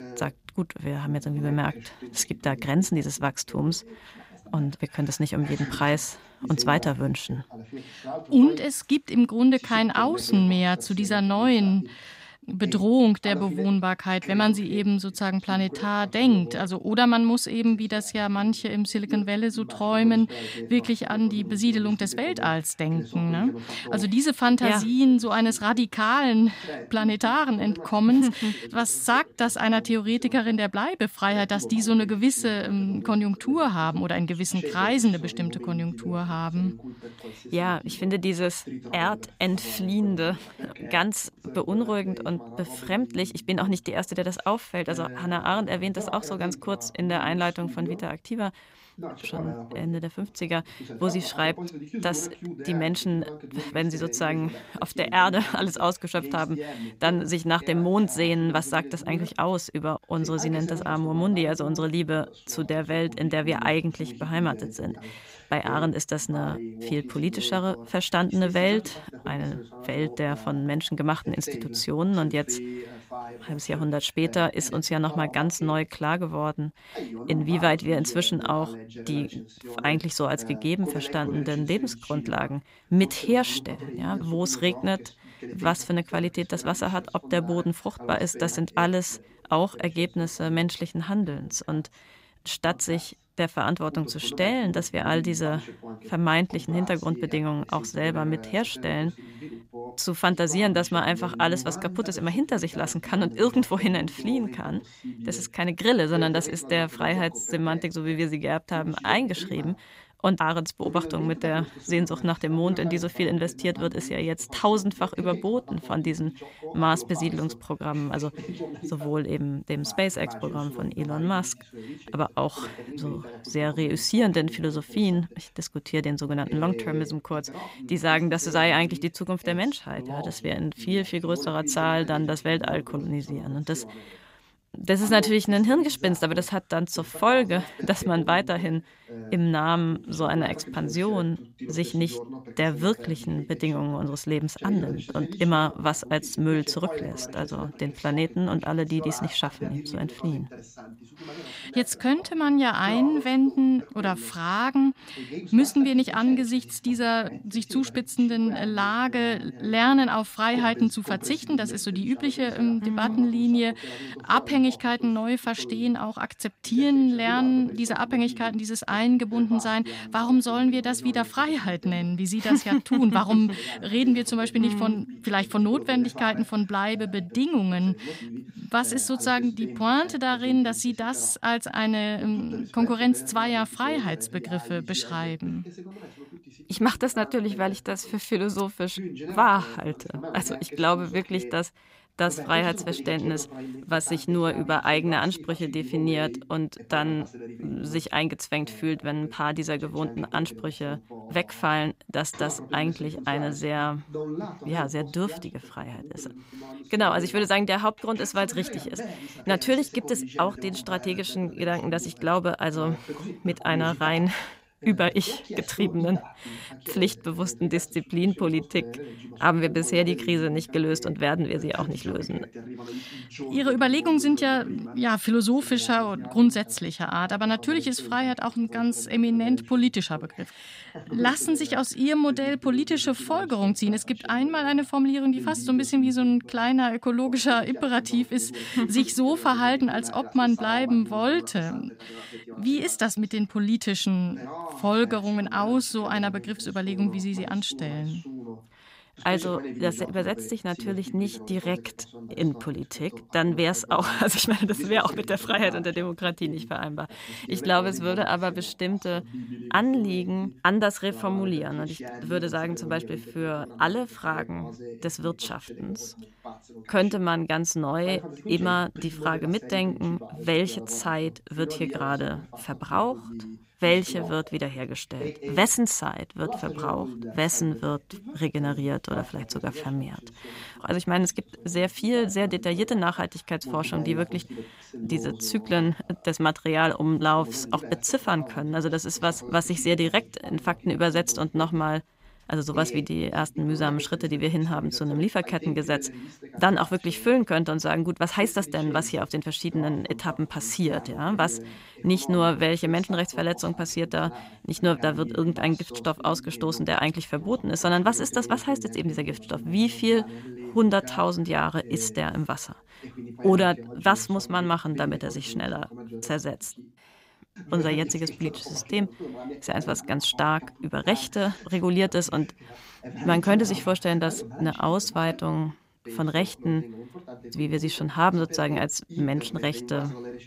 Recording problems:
voice in the background; noticeable; throughout; 15 dB below the speech

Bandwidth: 15.5 kHz